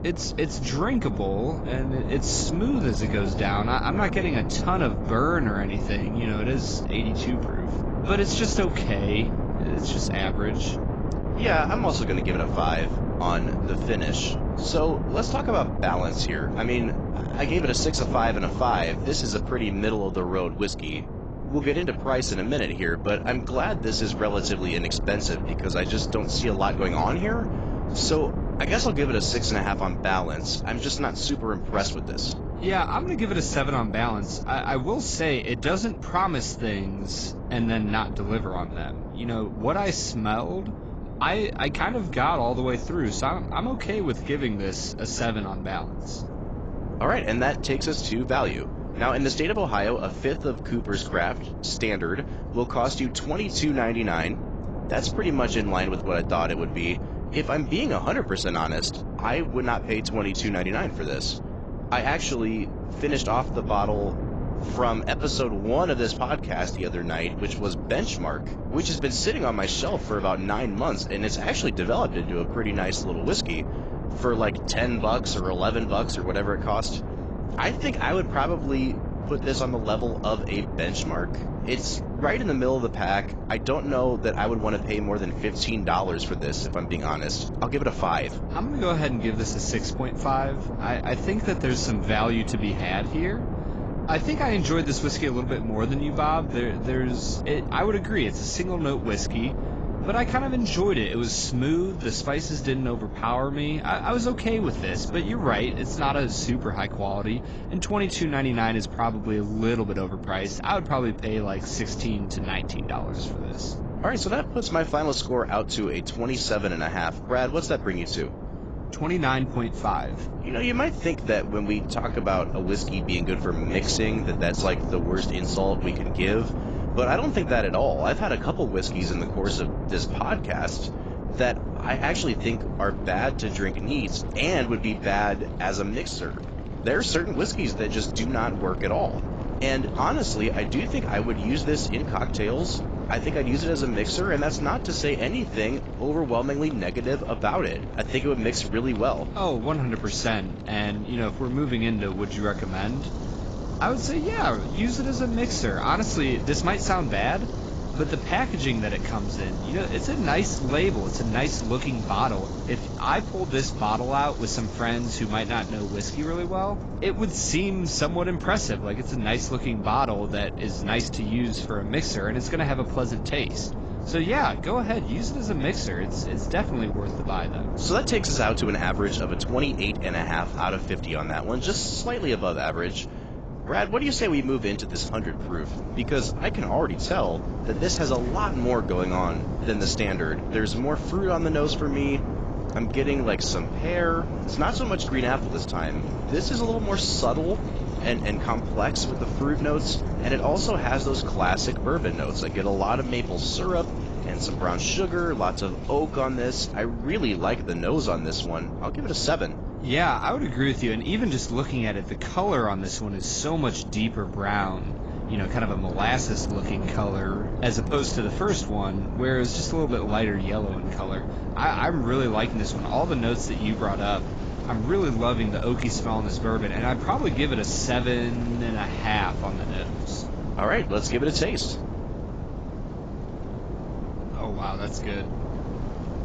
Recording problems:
garbled, watery; badly; nothing above 7.5 kHz
wind noise on the microphone; occasional gusts; 10 dB below the speech
rain or running water; faint; throughout; 25 dB below the speech

